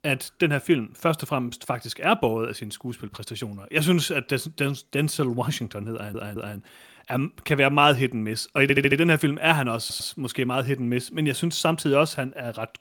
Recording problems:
audio stuttering; at 6 s, at 8.5 s and at 10 s

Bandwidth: 17.5 kHz